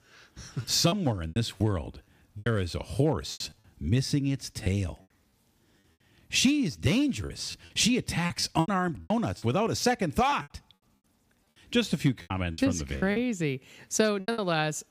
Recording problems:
choppy; very; 11% of the speech affected

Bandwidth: 15 kHz